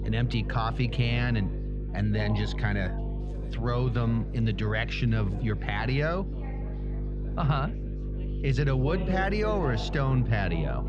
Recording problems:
muffled; very slightly; fading above 4 kHz
electrical hum; noticeable; throughout; 50 Hz, 15 dB below the speech
chatter from many people; noticeable; throughout; 15 dB below the speech

